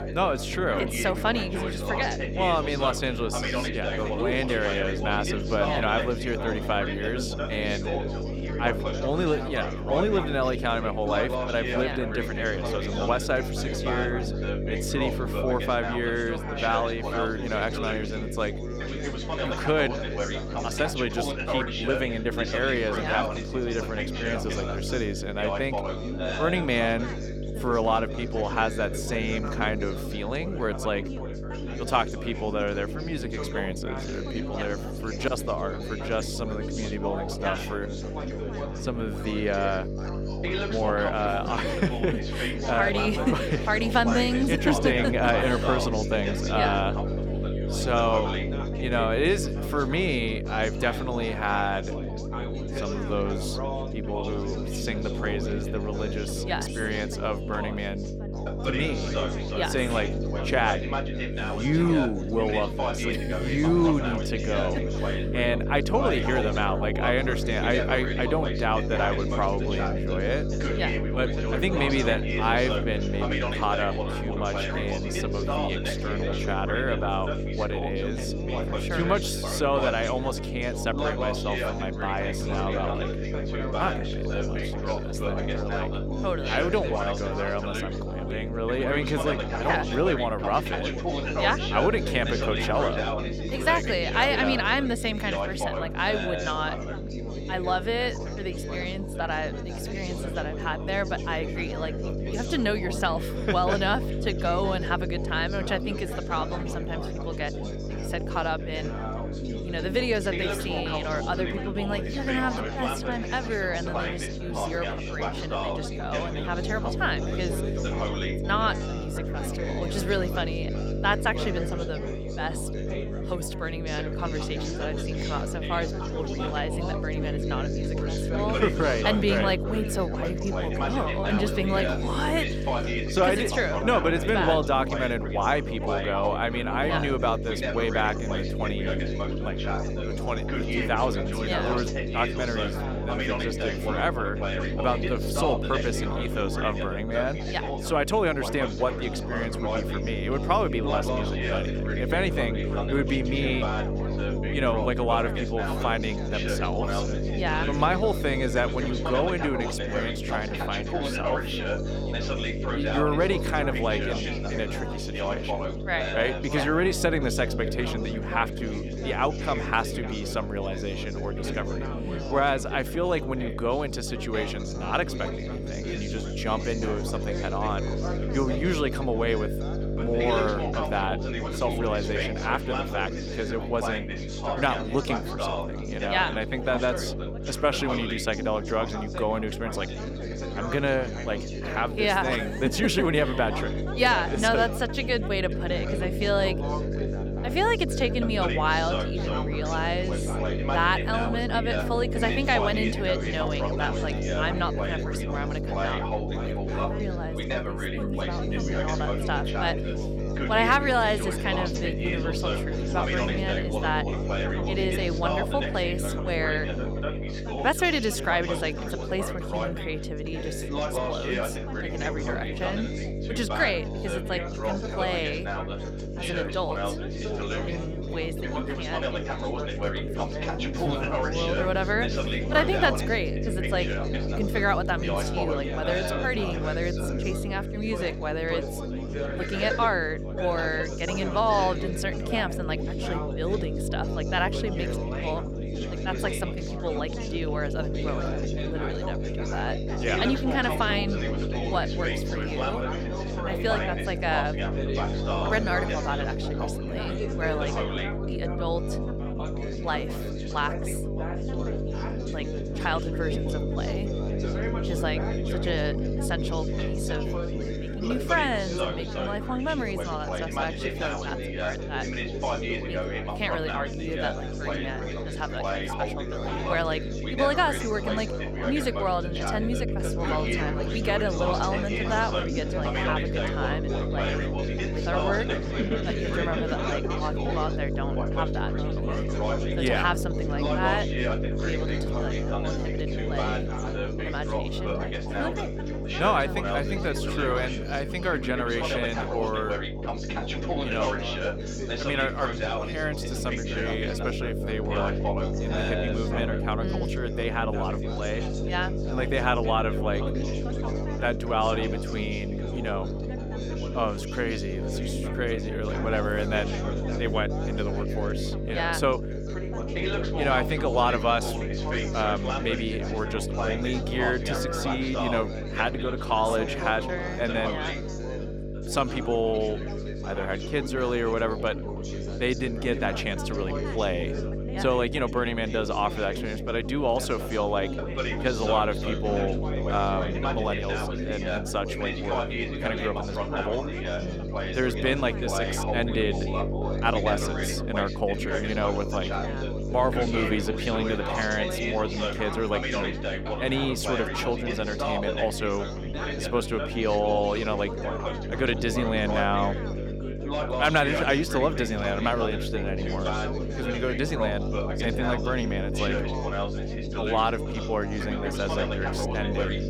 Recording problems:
electrical hum; loud; throughout; 50 Hz, 9 dB below the speech
background chatter; loud; throughout; 4 voices, 5 dB below the speech

